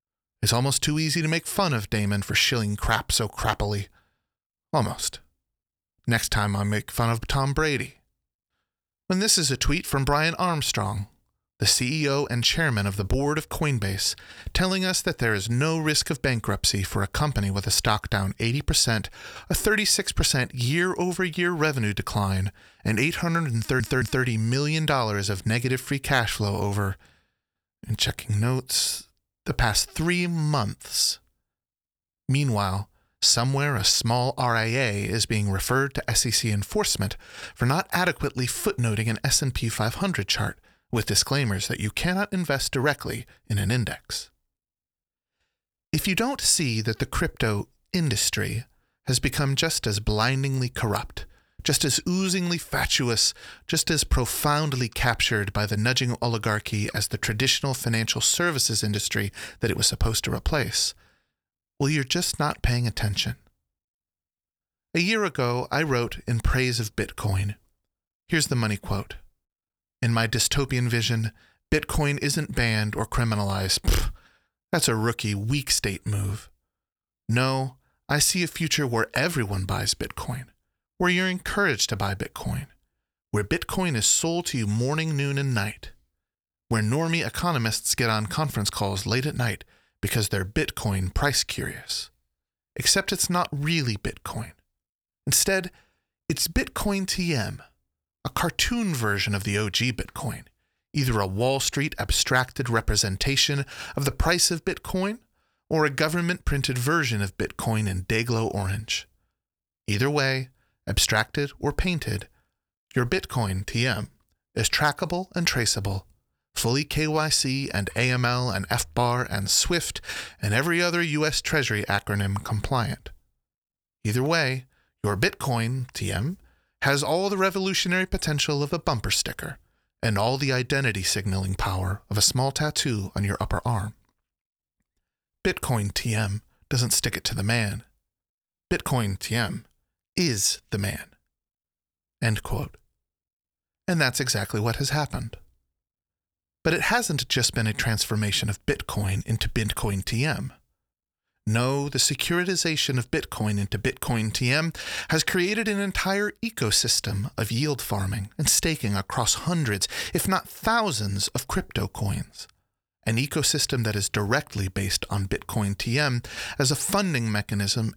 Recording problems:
audio stuttering; at 24 s

